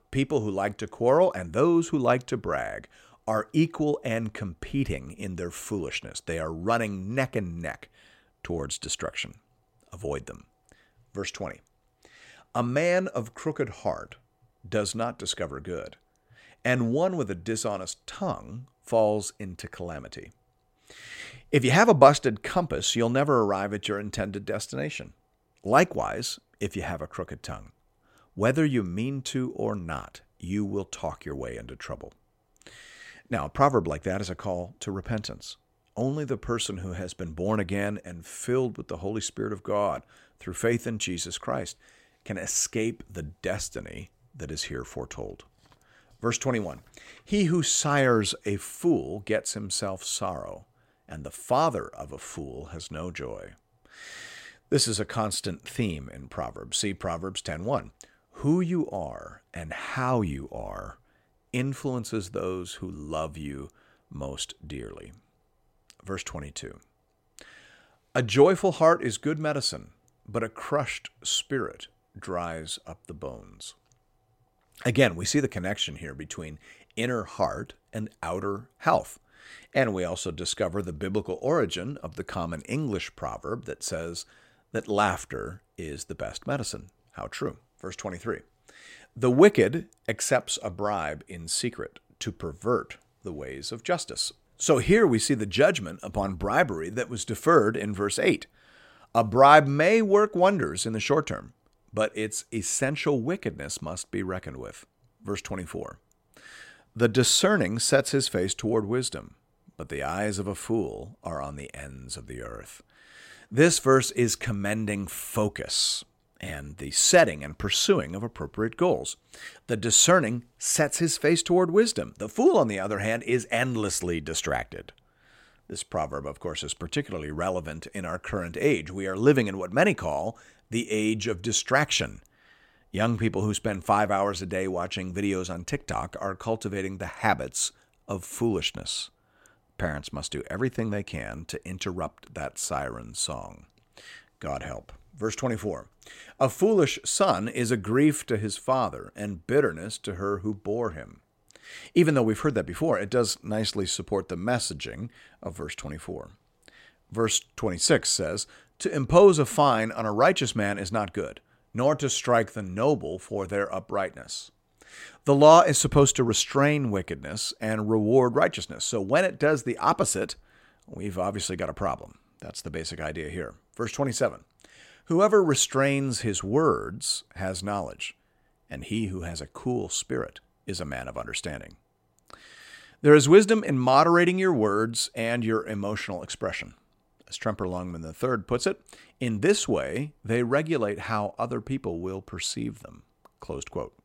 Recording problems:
none

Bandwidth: 16 kHz